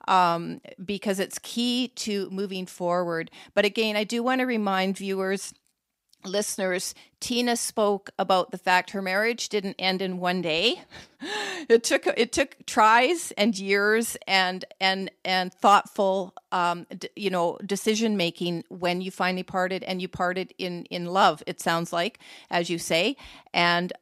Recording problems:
none

